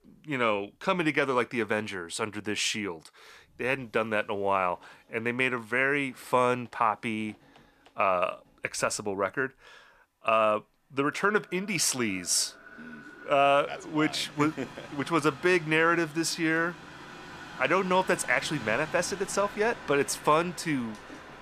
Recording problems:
echo of what is said; faint; from 11 s on; 430 ms later, 25 dB below the speech
train or aircraft noise; noticeable; throughout; 15 dB below the speech

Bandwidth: 14.5 kHz